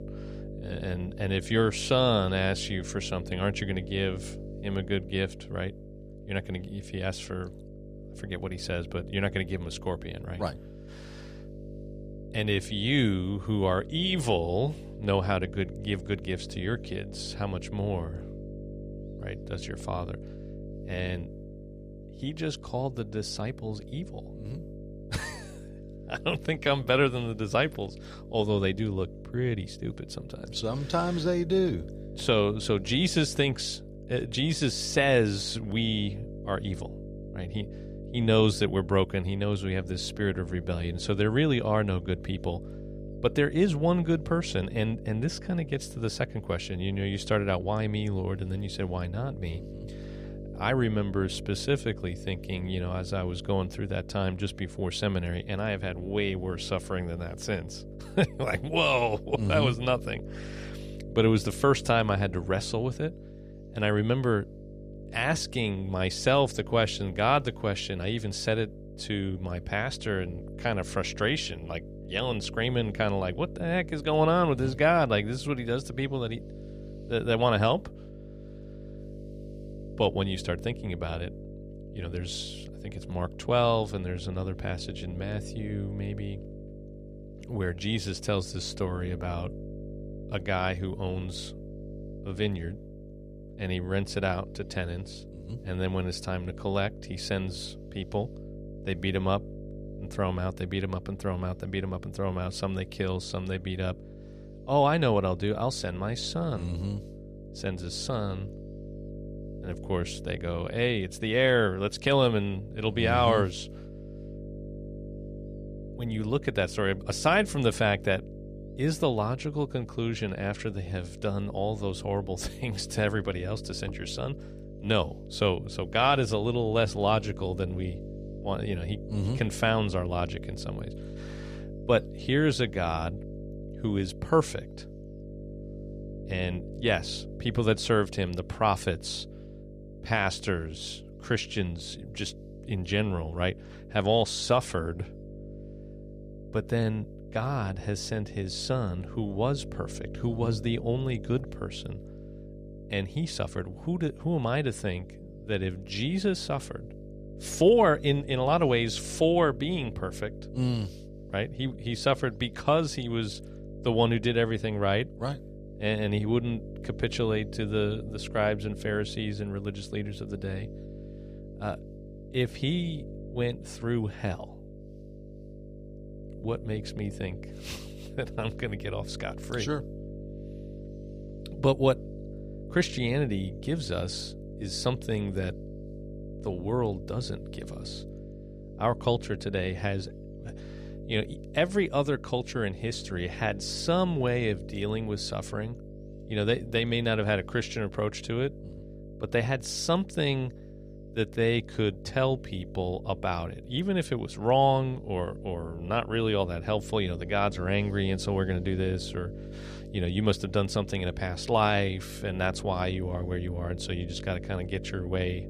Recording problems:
electrical hum; noticeable; throughout; 50 Hz, 15 dB below the speech

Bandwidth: 14.5 kHz